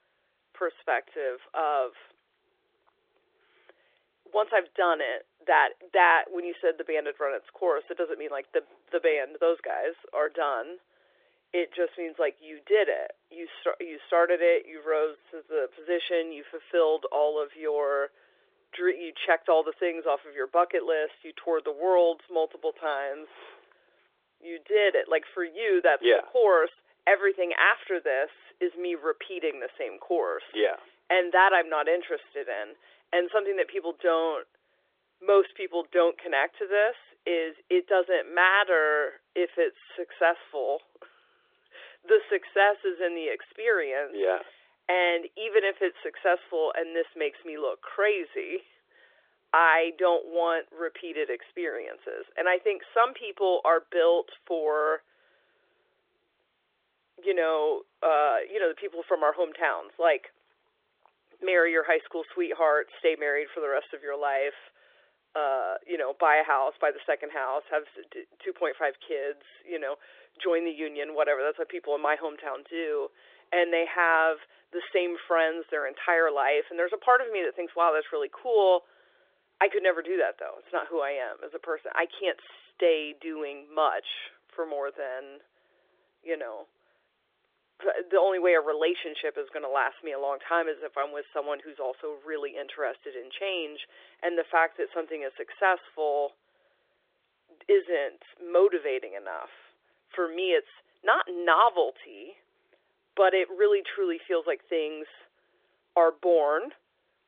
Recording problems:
phone-call audio; nothing above 3.5 kHz

